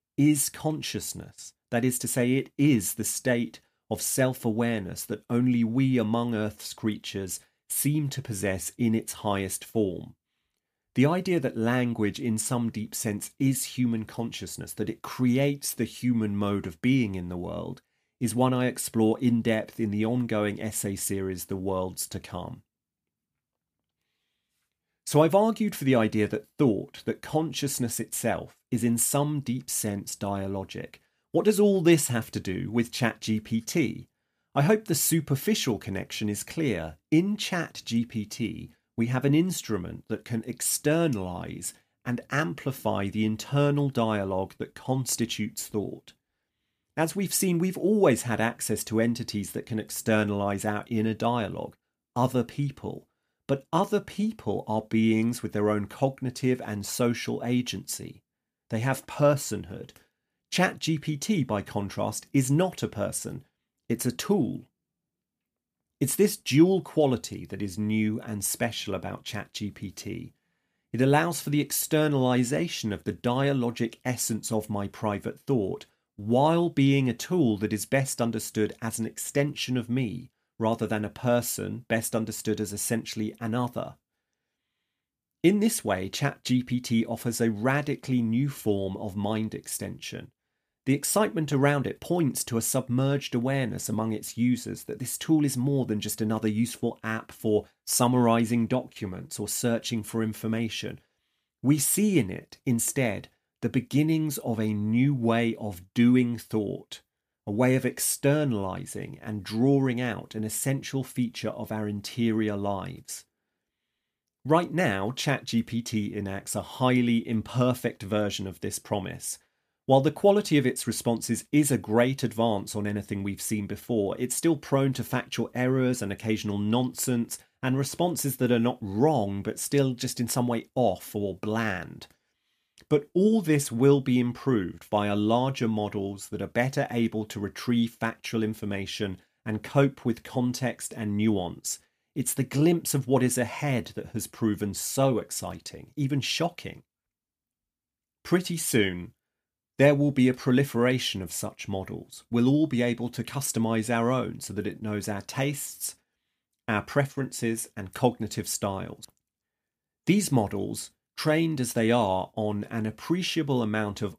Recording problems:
none

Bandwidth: 15 kHz